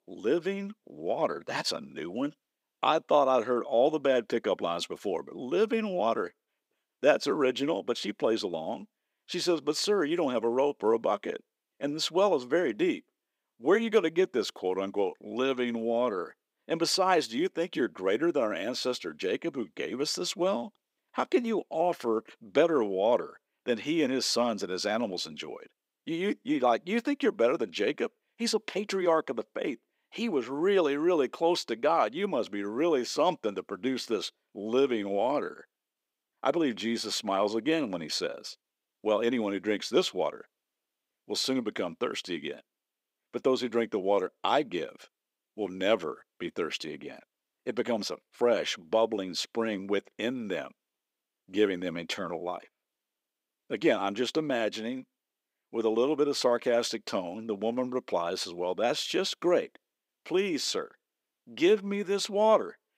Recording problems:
thin; somewhat; fading below 300 Hz

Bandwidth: 15.5 kHz